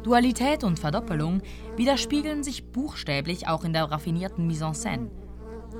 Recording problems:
electrical hum; noticeable; throughout; 60 Hz, 15 dB below the speech

